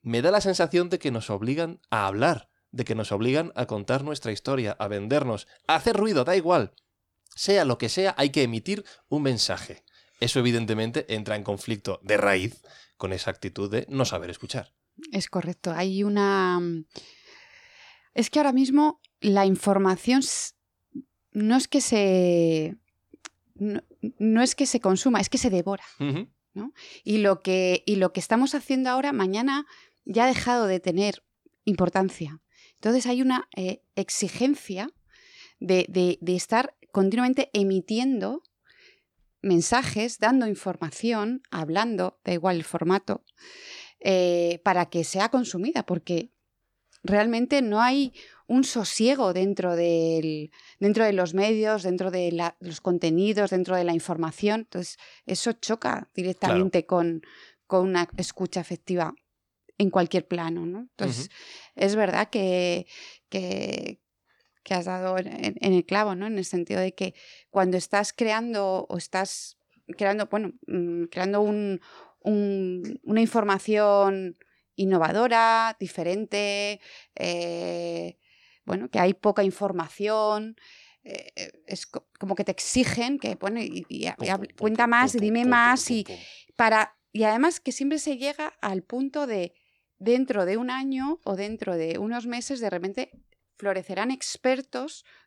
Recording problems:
none

